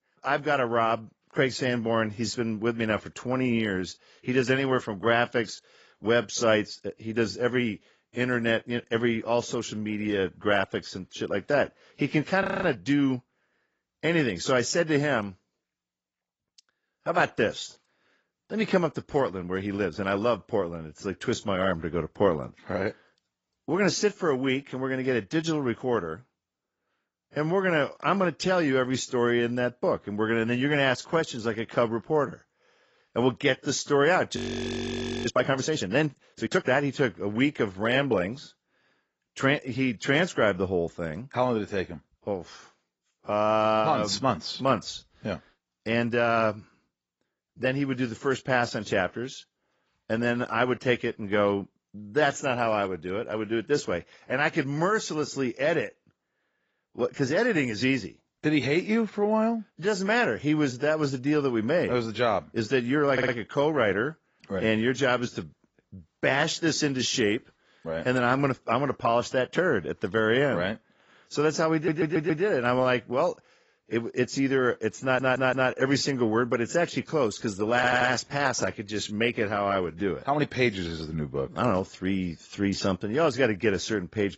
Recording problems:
garbled, watery; badly; nothing above 7.5 kHz
audio freezing; at 12 s and at 34 s for 1 s
audio stuttering; 4 times, first at 1:03

